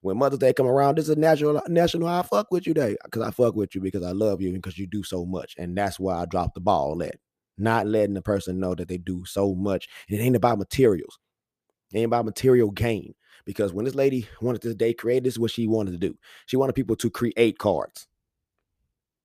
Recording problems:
none

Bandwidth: 14.5 kHz